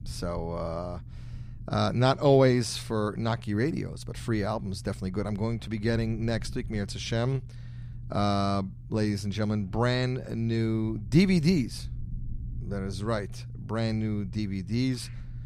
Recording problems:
low rumble; faint; throughout; 25 dB below the speech

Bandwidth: 14.5 kHz